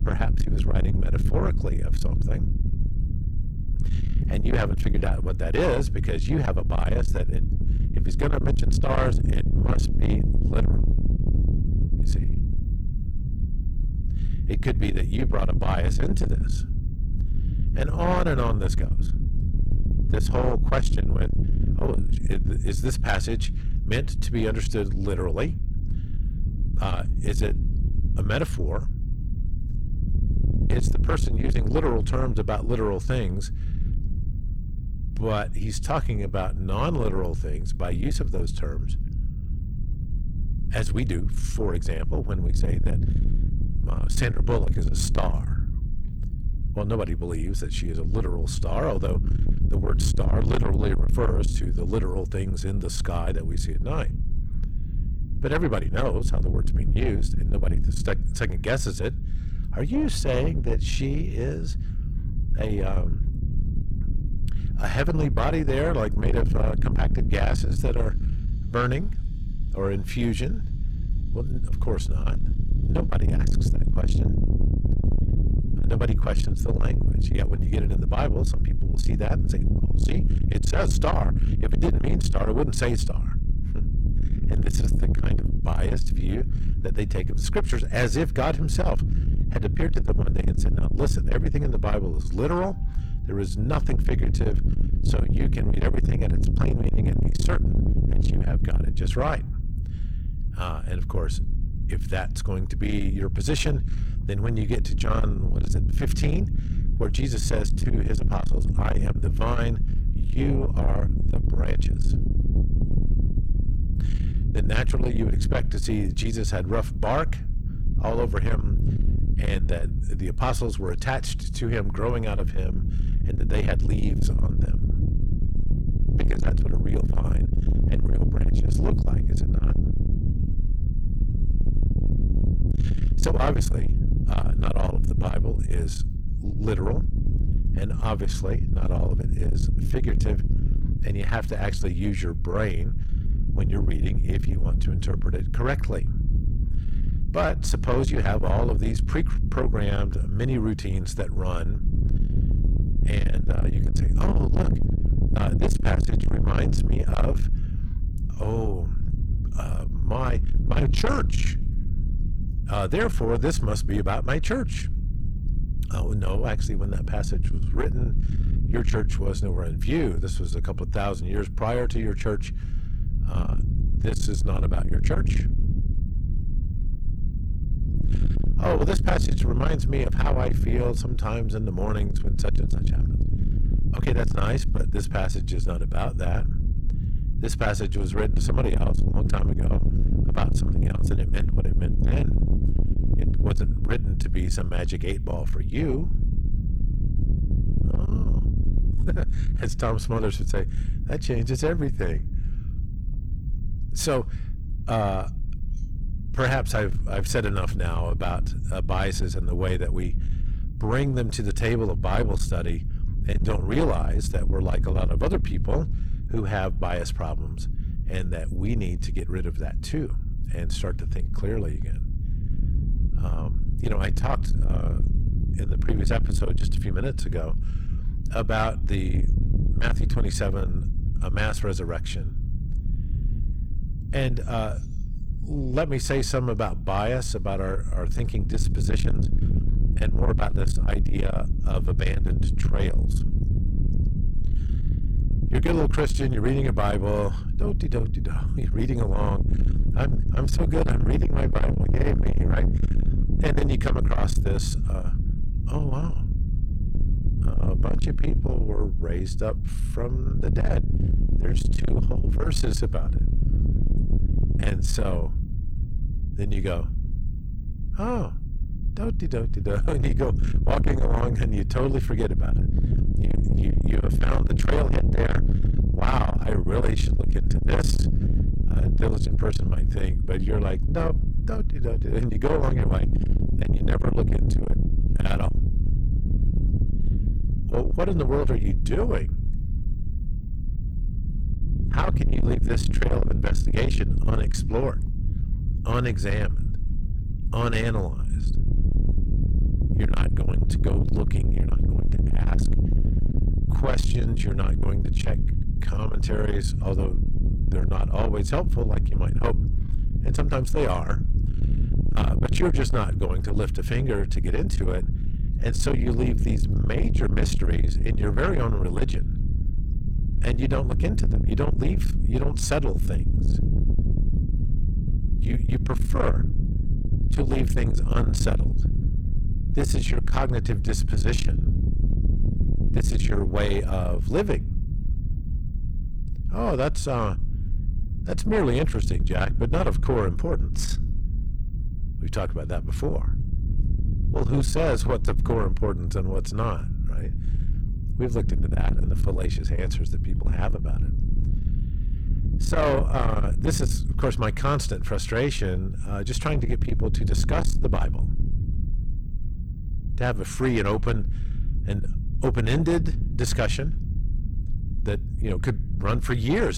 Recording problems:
distortion; heavy; 7 dB below the speech
low rumble; loud; throughout; 8 dB below the speech
abrupt cut into speech; at the end

